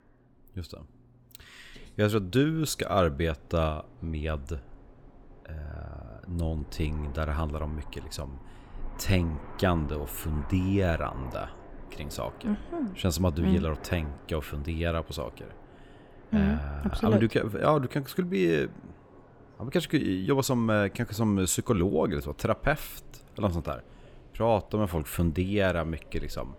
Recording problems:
train or aircraft noise; faint; throughout; 20 dB below the speech

